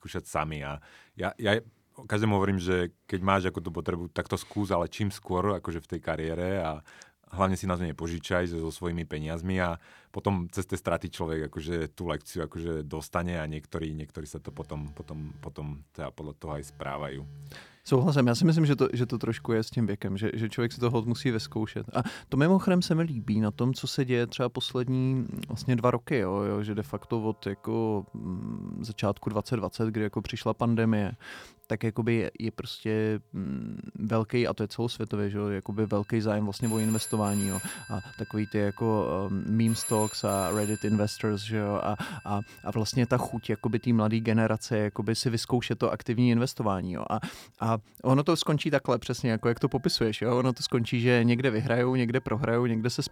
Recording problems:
alarms or sirens; noticeable; from 14 s on; 15 dB below the speech

